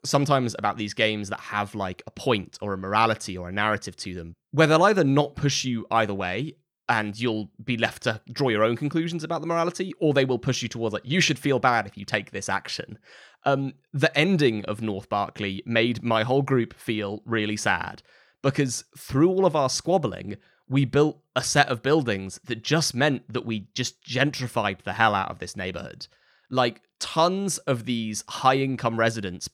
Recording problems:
none

